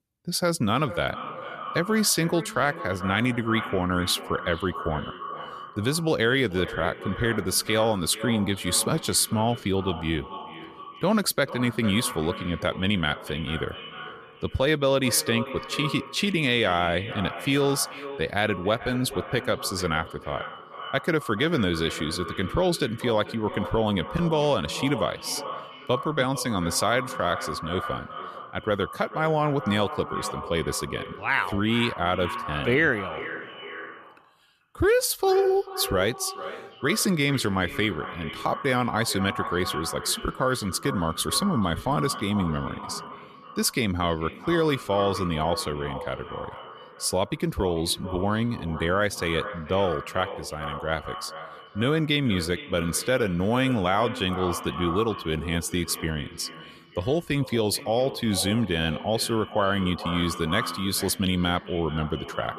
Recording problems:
echo of what is said; strong; throughout; 440 ms later, 10 dB below the speech

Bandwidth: 14.5 kHz